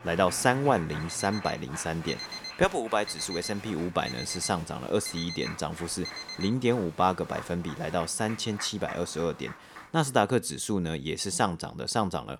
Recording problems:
crowd noise; noticeable; until 10 s; 15 dB below the speech
alarm; noticeable; from 1 to 6.5 s; peak 7 dB below the speech

